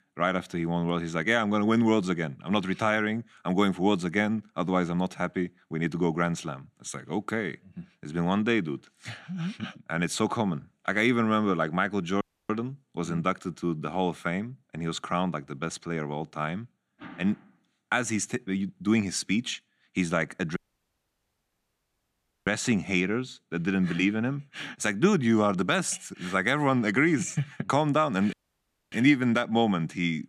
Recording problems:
audio cutting out; at 12 s, at 21 s for 2 s and at 28 s for 0.5 s

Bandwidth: 14.5 kHz